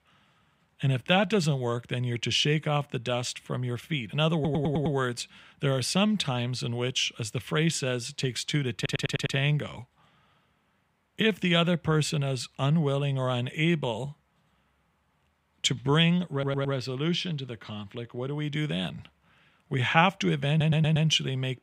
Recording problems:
audio stuttering; 4 times, first at 4.5 s

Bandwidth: 15.5 kHz